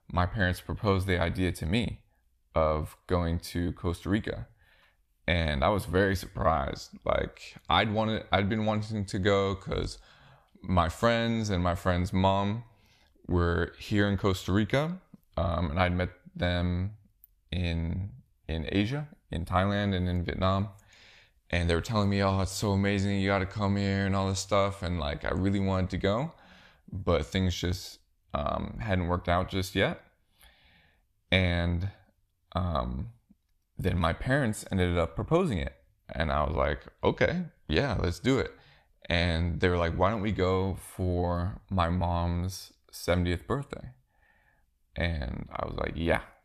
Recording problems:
none

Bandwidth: 14.5 kHz